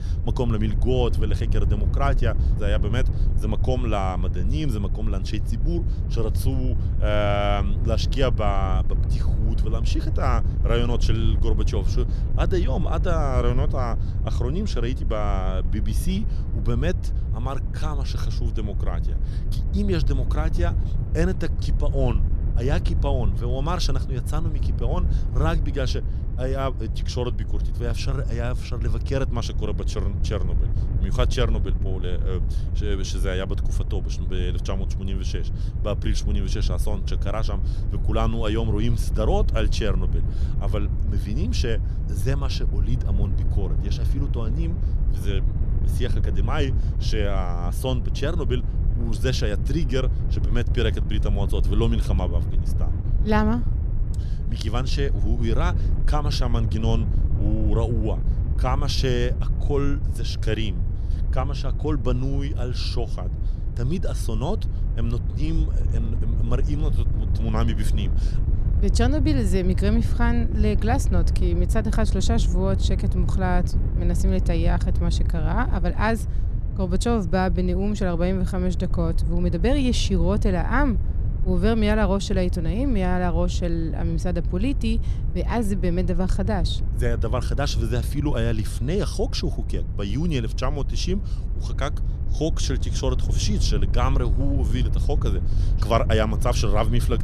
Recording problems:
wind noise on the microphone; occasional gusts; 10 dB below the speech

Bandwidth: 13.5 kHz